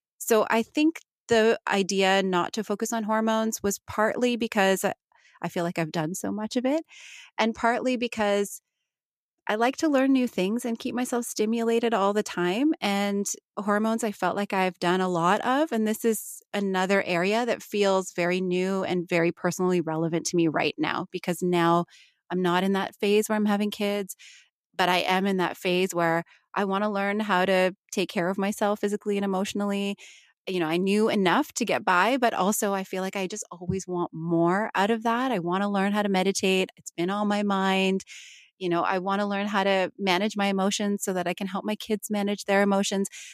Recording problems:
none

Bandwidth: 14.5 kHz